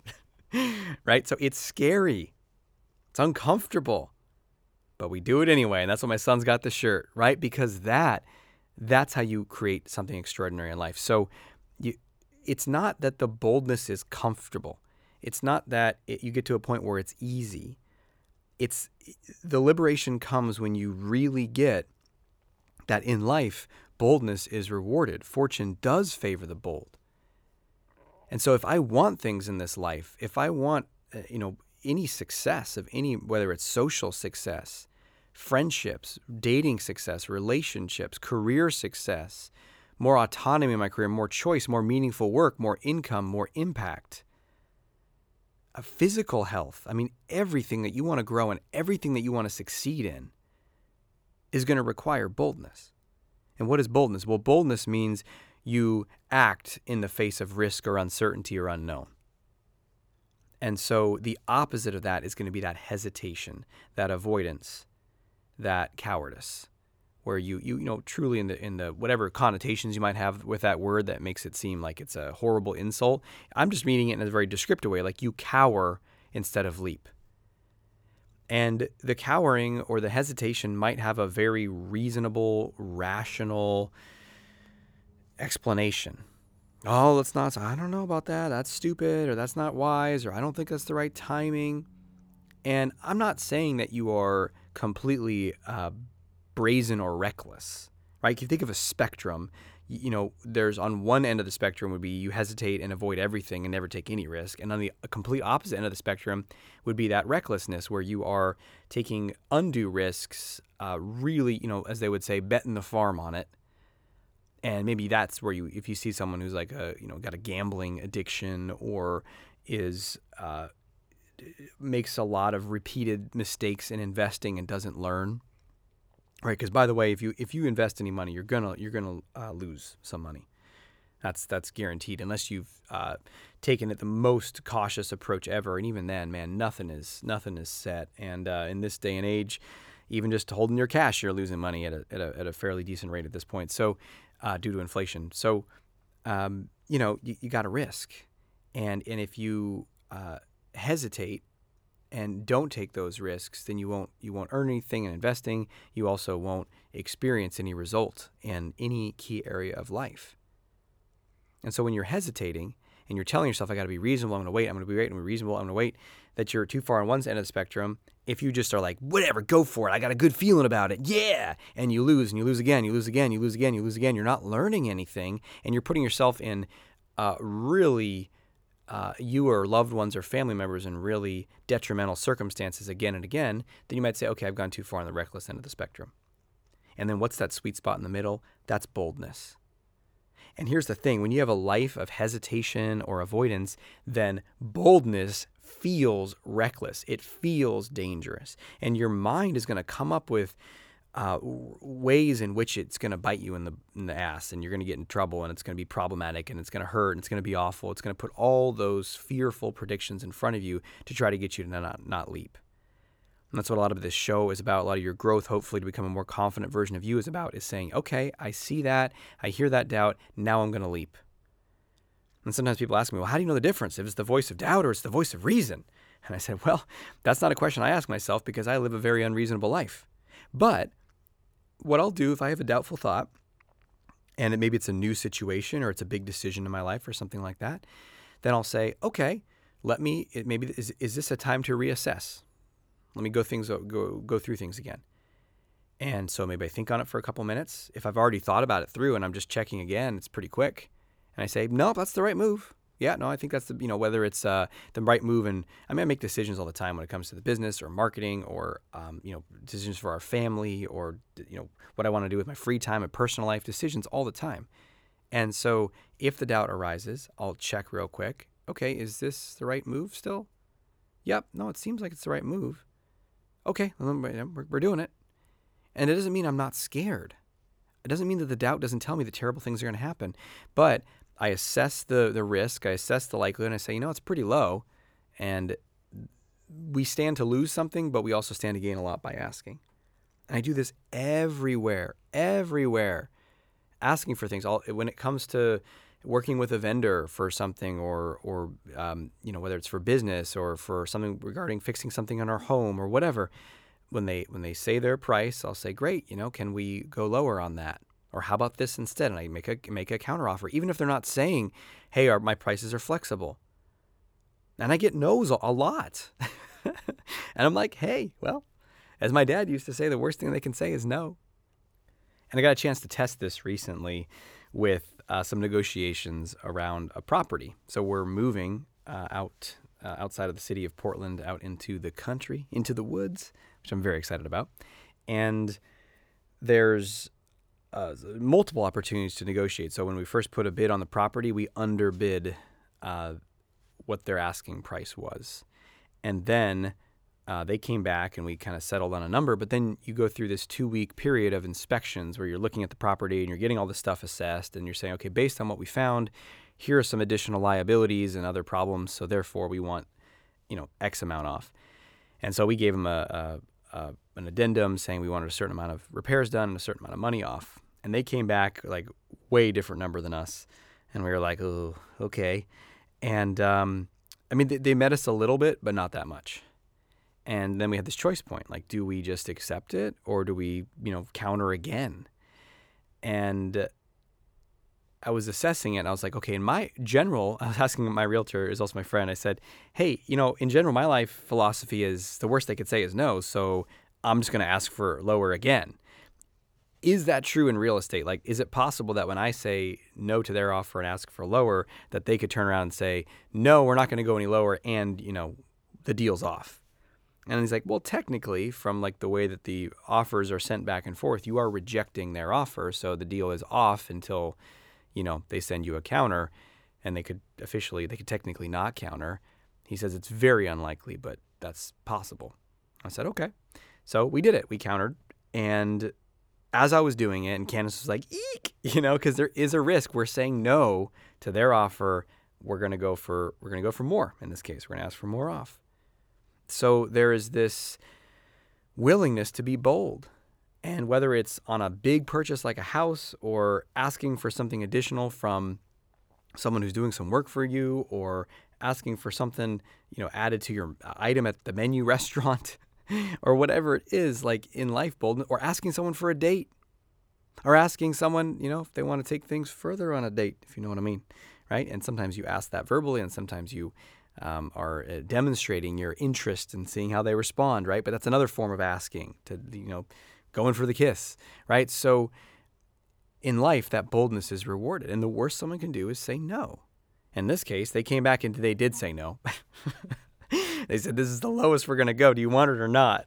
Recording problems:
none

